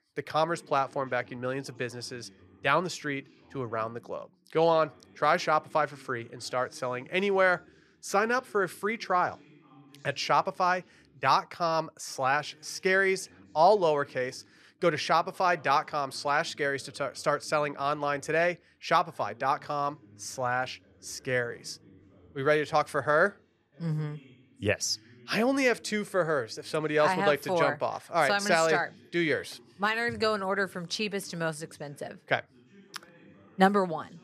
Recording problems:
voice in the background; faint; throughout; 30 dB below the speech

